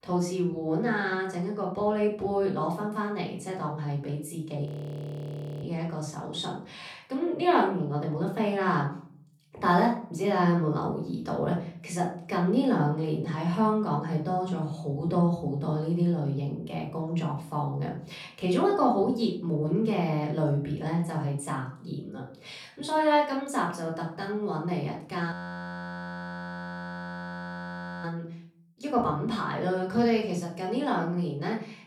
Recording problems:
off-mic speech; far
room echo; slight; dies away in 0.5 s
audio freezing; at 4.5 s for 1 s and at 25 s for 2.5 s

